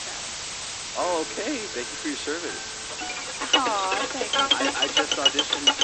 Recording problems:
garbled, watery; slightly; nothing above 7 kHz
thin; very slightly; fading below 300 Hz
background music; very loud; throughout; 7 dB above the speech
hiss; loud; throughout; 1 dB below the speech

